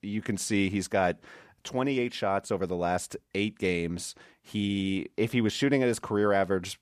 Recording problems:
none

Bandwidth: 14.5 kHz